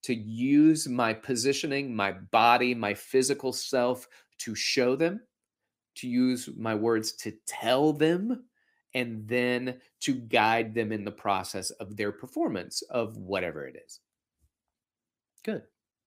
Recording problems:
none

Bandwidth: 15.5 kHz